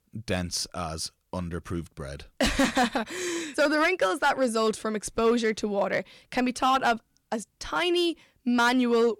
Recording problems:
distortion; slight; 4% of the sound clipped

